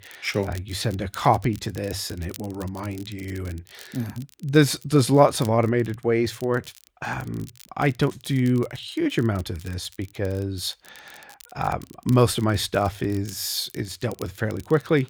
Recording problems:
crackle, like an old record; faint; 25 dB below the speech

